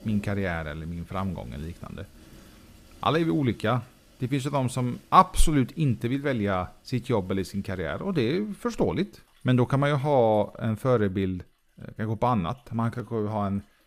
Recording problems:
rain or running water; faint; throughout; 30 dB below the speech

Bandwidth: 15 kHz